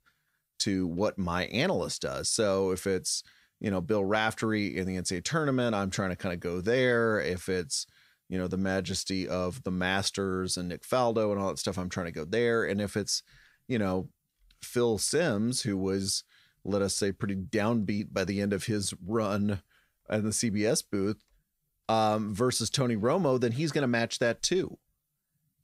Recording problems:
none

